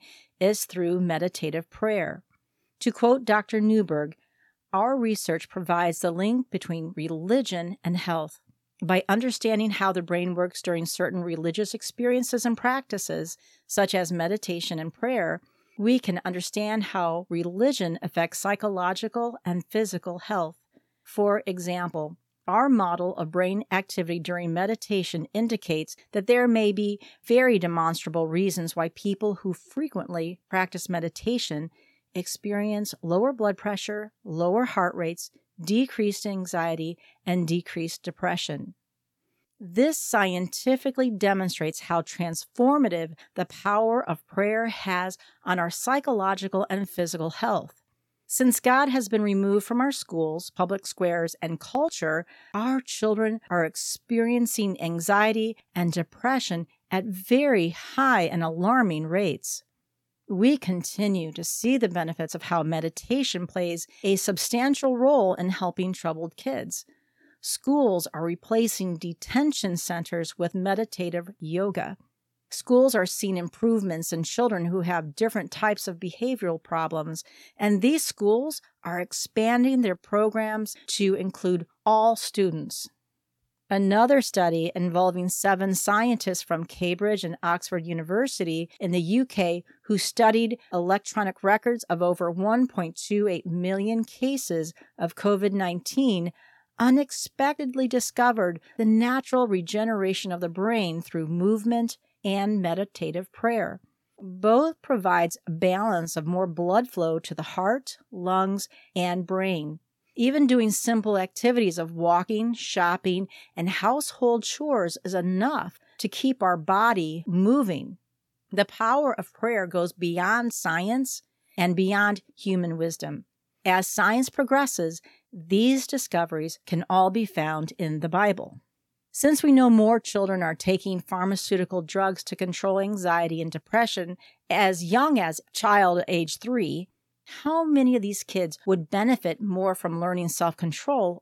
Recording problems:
none

